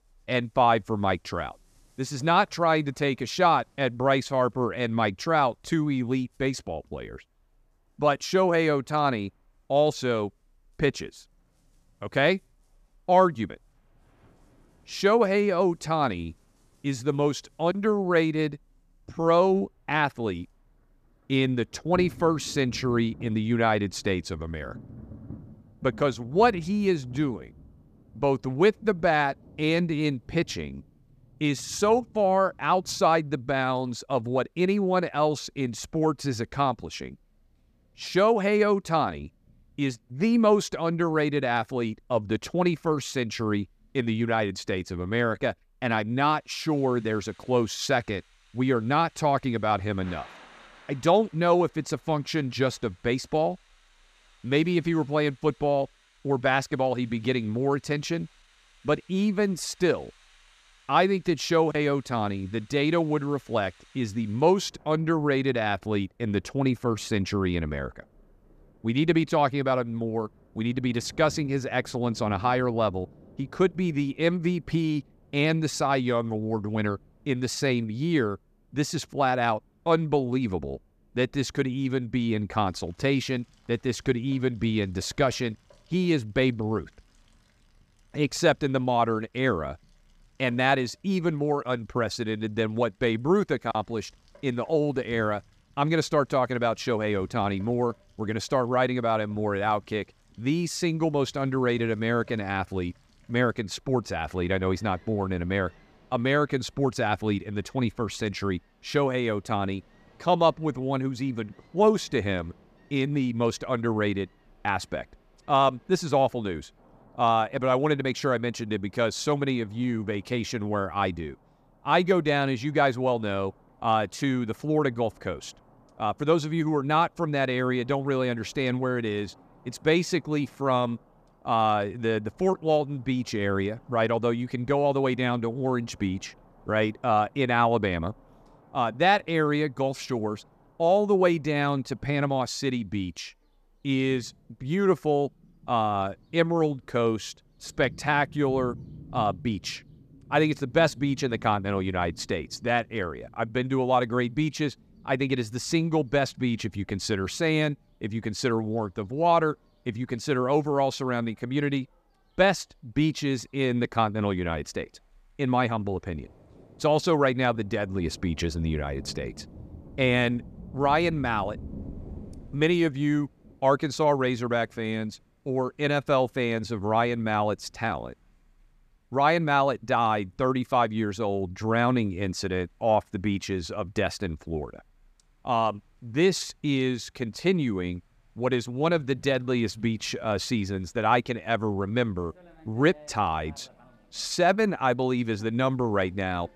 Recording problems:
rain or running water; faint; throughout; 25 dB below the speech

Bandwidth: 14.5 kHz